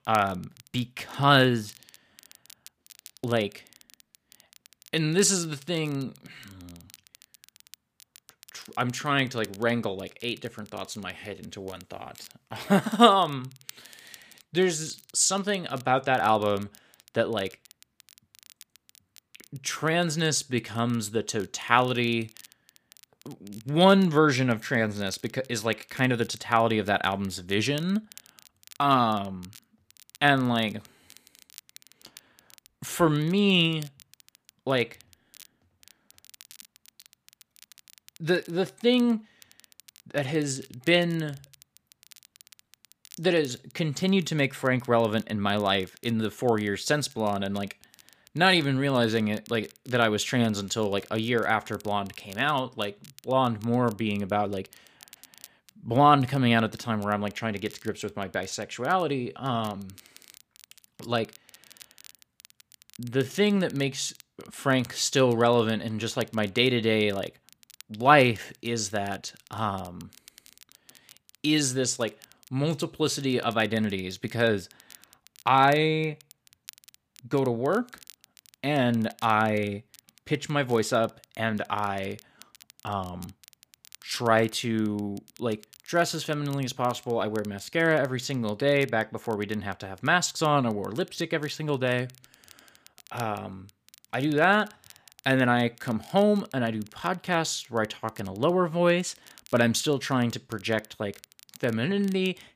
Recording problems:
crackle, like an old record; faint; 25 dB below the speech

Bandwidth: 15 kHz